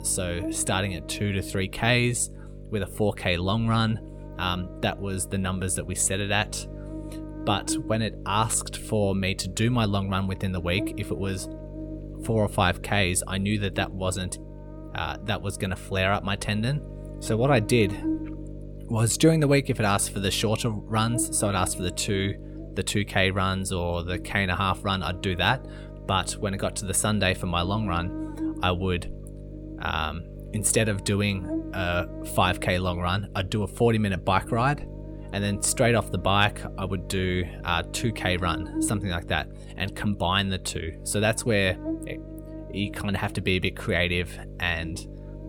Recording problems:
electrical hum; noticeable; throughout; 50 Hz, 15 dB below the speech

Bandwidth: 18 kHz